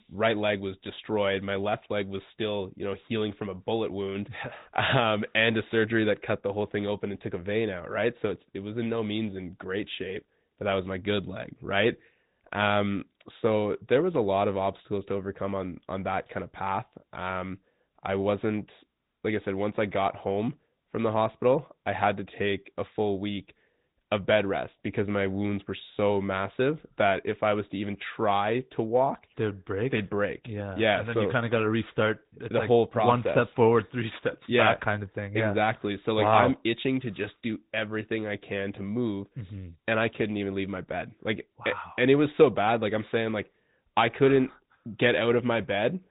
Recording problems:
high frequencies cut off; severe; nothing above 4 kHz
garbled, watery; slightly

